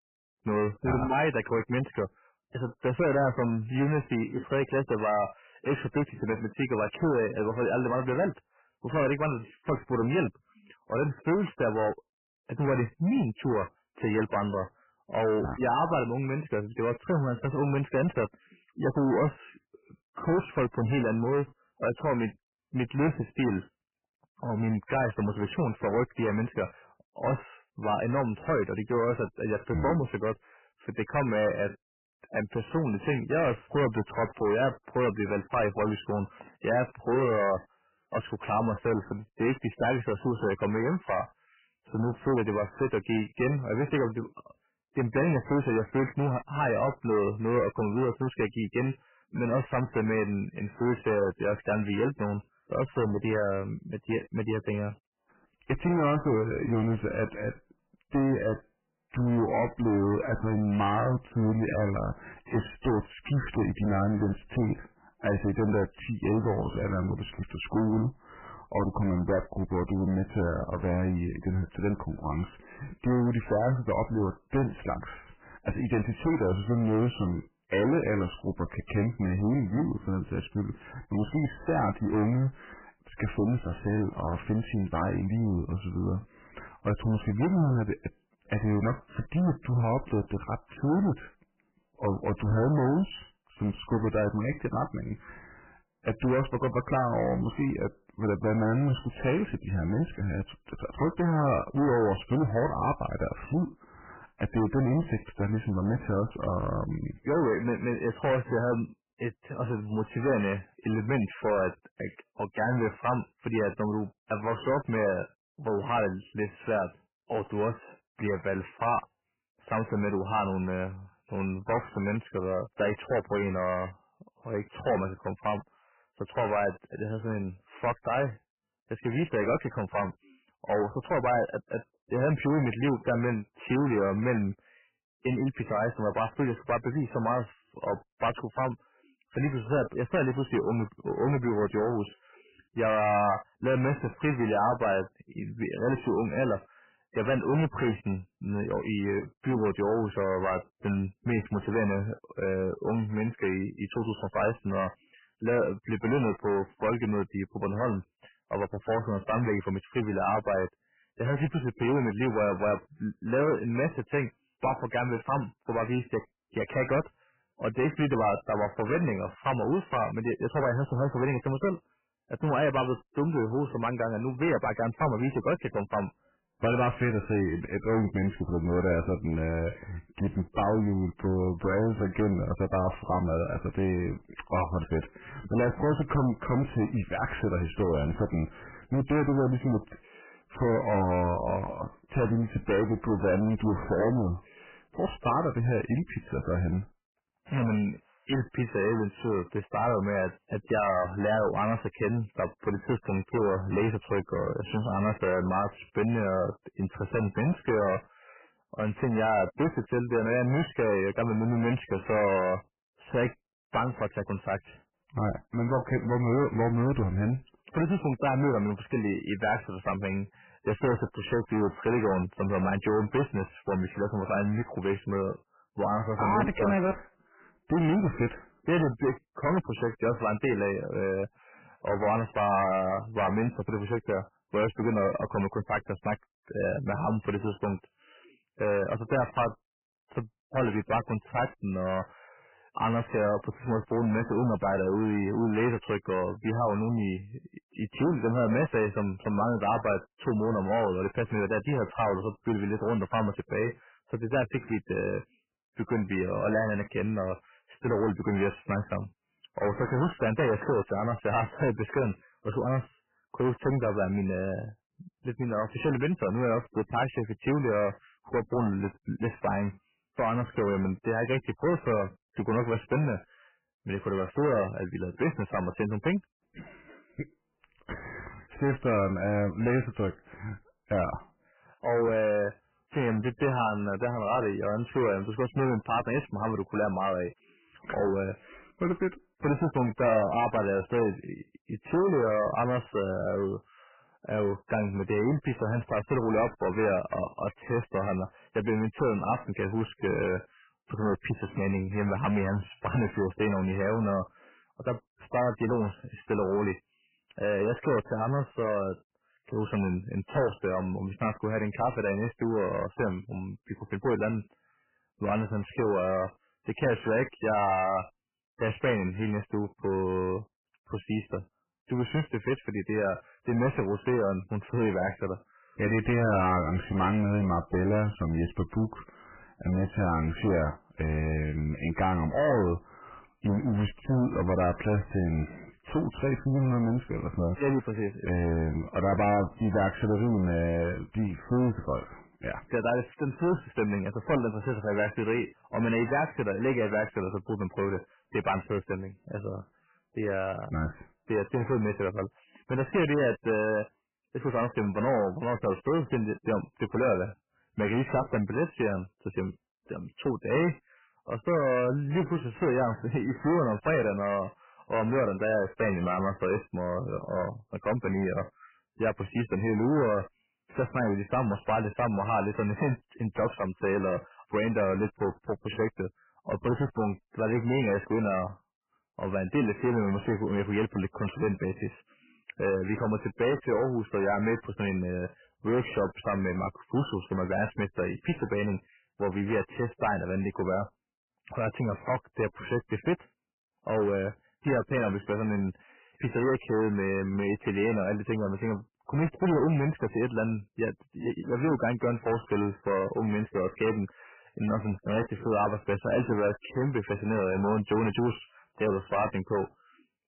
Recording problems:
distortion; heavy; 11% of the sound clipped
garbled, watery; badly; nothing above 3 kHz

